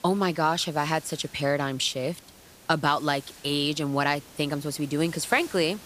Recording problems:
hiss; faint; throughout; 20 dB below the speech

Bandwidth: 15 kHz